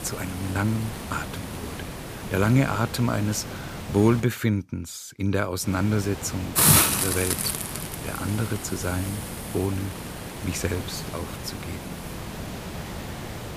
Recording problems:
hiss; loud; until 4 s and from 5.5 s on; 1 dB below the speech

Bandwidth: 15 kHz